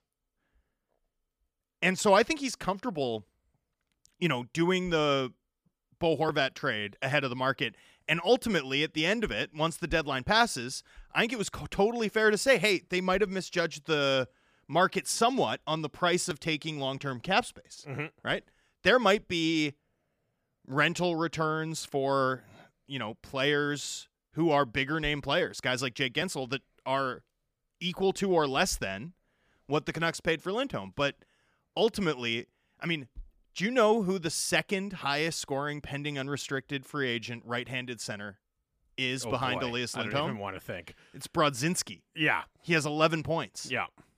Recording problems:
none

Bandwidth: 15 kHz